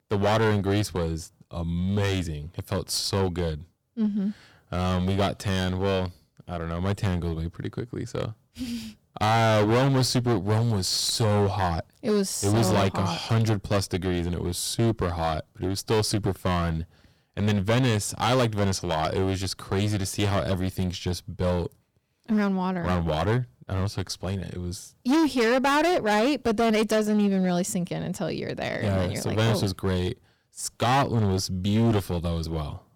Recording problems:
distortion; heavy; 12% of the sound clipped

